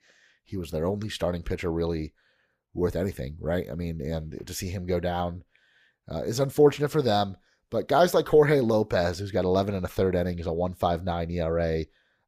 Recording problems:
none

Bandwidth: 15 kHz